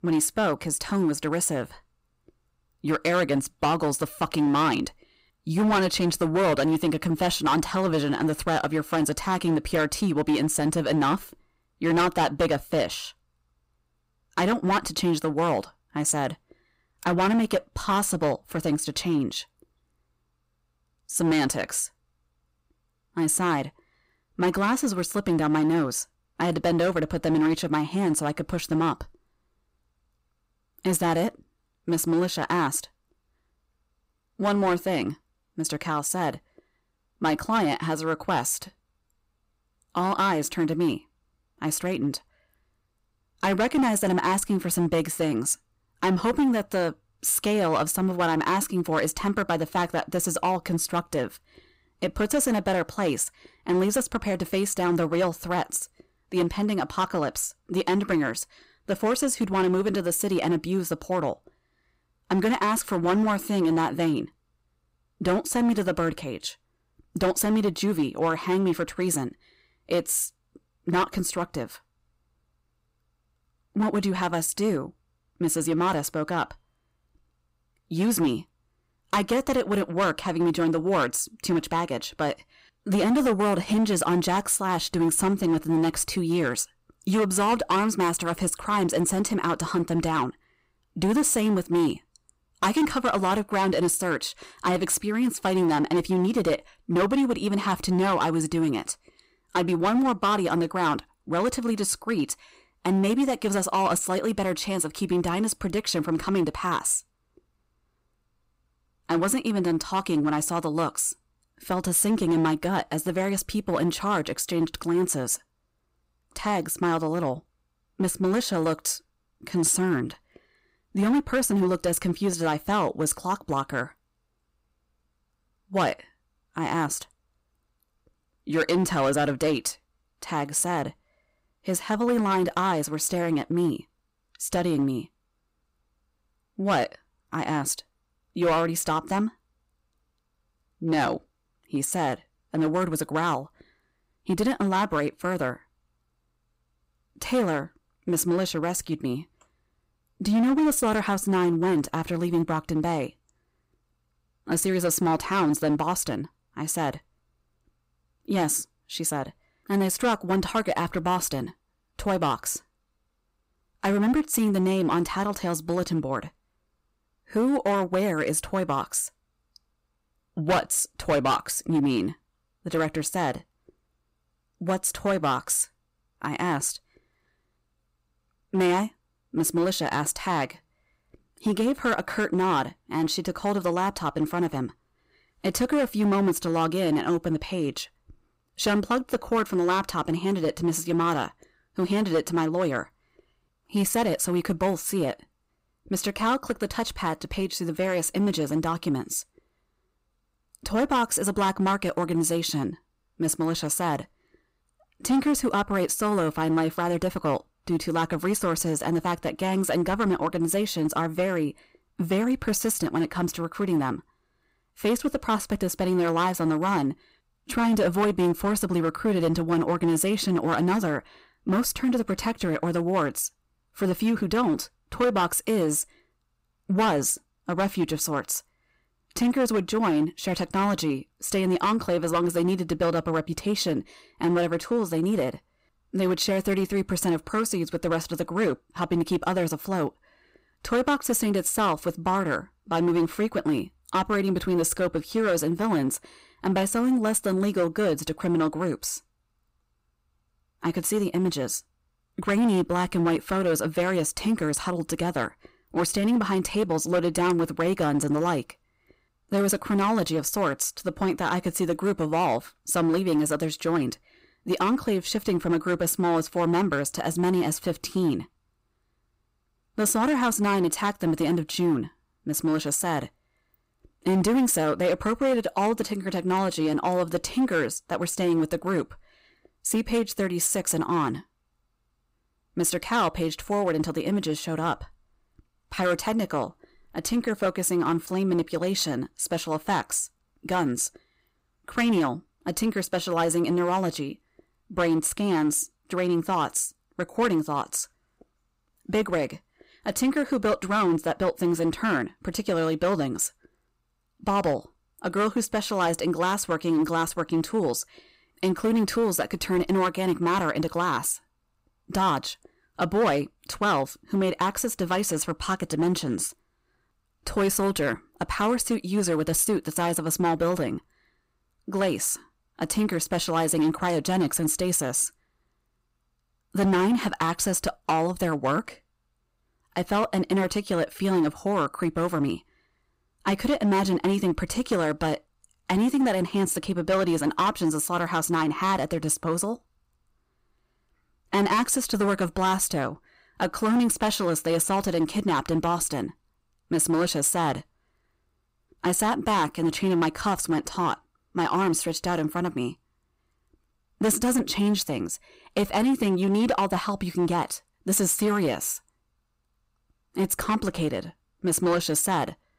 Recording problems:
distortion; slight; 7% of the sound clipped

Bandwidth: 15.5 kHz